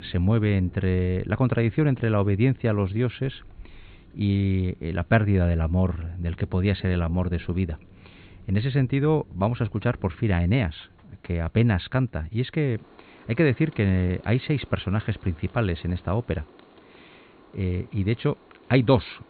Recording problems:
high frequencies cut off; severe; nothing above 4.5 kHz
rain or running water; faint; throughout; 25 dB below the speech

